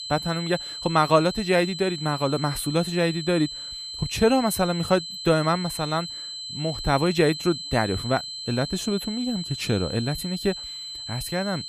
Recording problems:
high-pitched whine; loud; throughout; 4 kHz, 8 dB below the speech

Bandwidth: 15 kHz